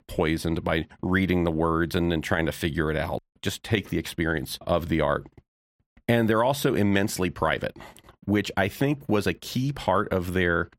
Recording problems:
none

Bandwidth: 16 kHz